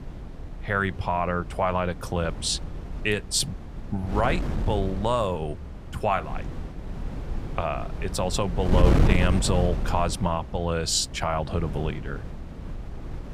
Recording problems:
wind noise on the microphone; occasional gusts; 10 dB below the speech

